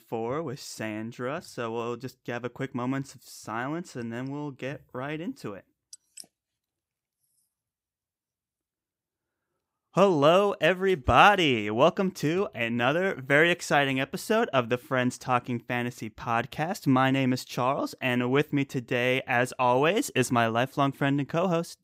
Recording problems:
none

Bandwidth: 15.5 kHz